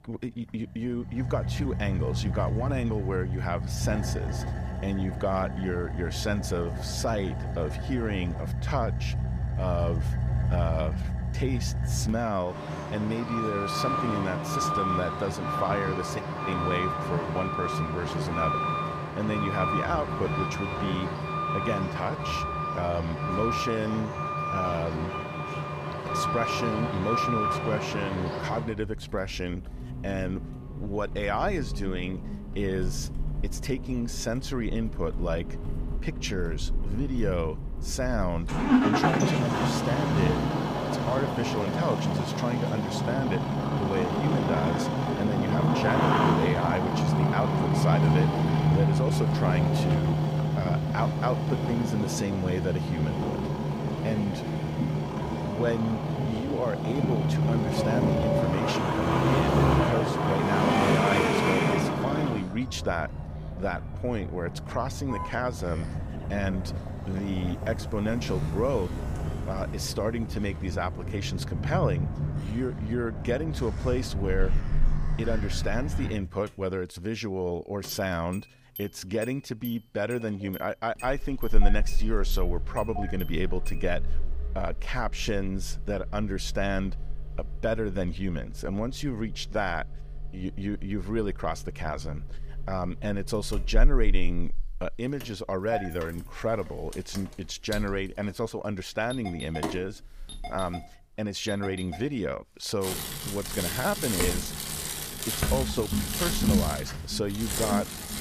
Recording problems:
traffic noise; very loud; throughout; 2 dB above the speech

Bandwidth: 15 kHz